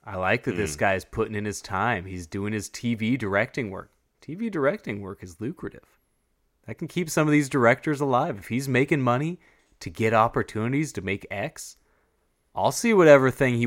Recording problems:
abrupt cut into speech; at the end

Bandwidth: 16 kHz